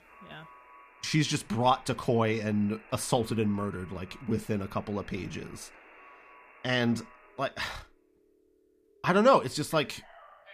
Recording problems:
alarms or sirens; faint; throughout; 25 dB below the speech

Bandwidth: 15 kHz